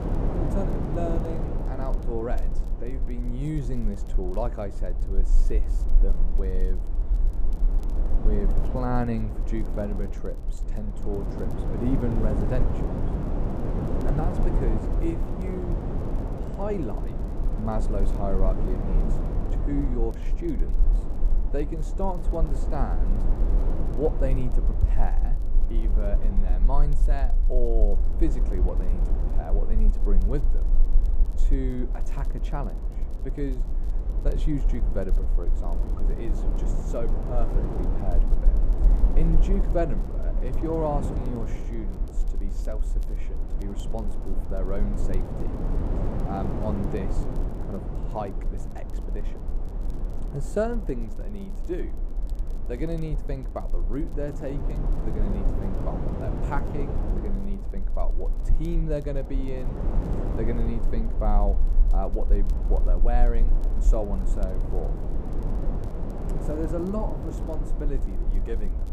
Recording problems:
muffled; slightly; fading above 1.5 kHz
wind noise on the microphone; heavy; 5 dB below the speech
low rumble; faint; throughout; 20 dB below the speech
crackle, like an old record; faint; 30 dB below the speech

